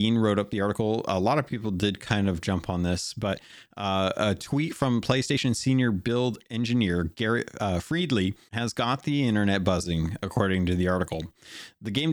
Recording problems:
abrupt cut into speech; at the start and the end
uneven, jittery; strongly; from 0.5 to 11 s

